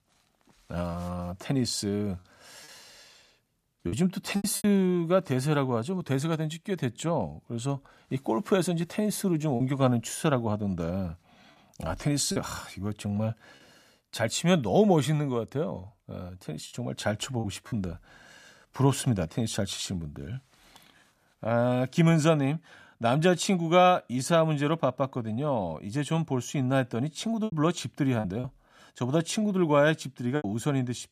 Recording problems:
choppy; occasionally; 3% of the speech affected

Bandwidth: 14.5 kHz